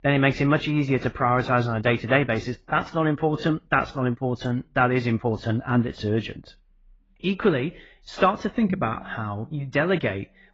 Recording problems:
garbled, watery; badly; nothing above 7.5 kHz
muffled; very slightly; fading above 3 kHz

